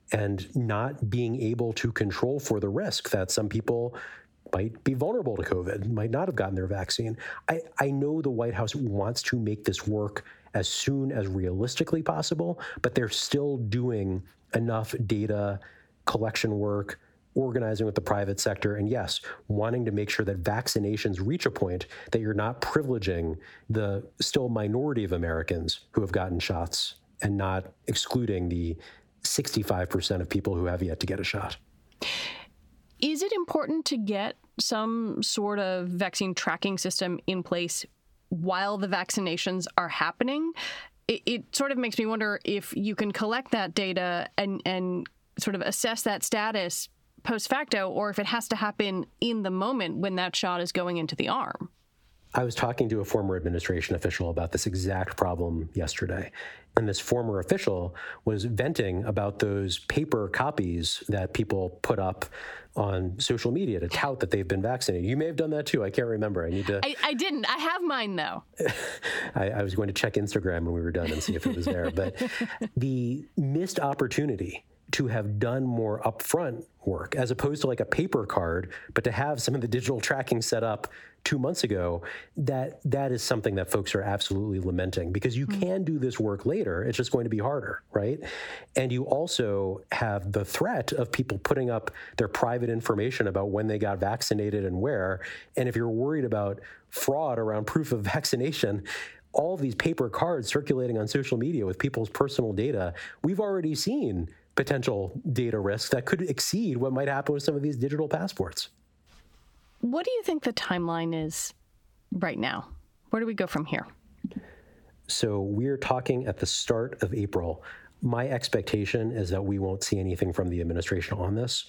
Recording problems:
squashed, flat; heavily

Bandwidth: 18 kHz